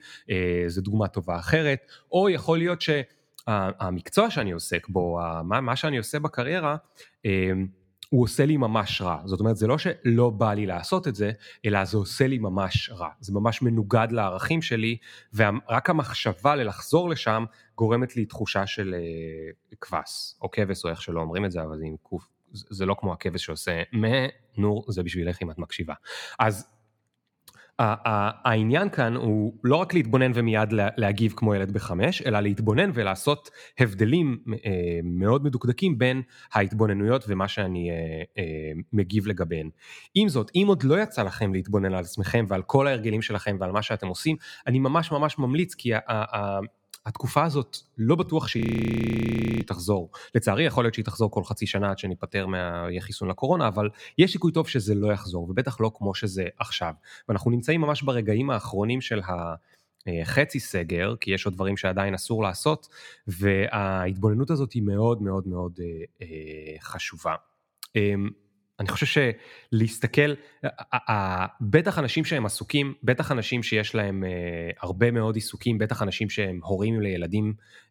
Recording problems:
audio freezing; at 49 s for 1 s

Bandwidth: 17.5 kHz